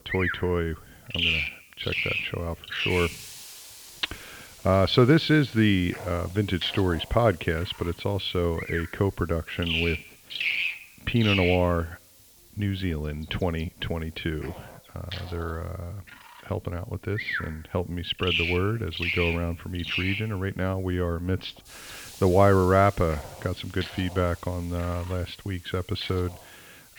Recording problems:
muffled; slightly; fading above 3 kHz
animal sounds; loud; throughout; 3 dB below the speech
hiss; faint; throughout; 20 dB below the speech

